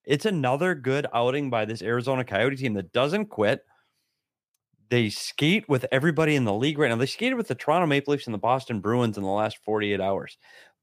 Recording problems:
none

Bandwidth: 15 kHz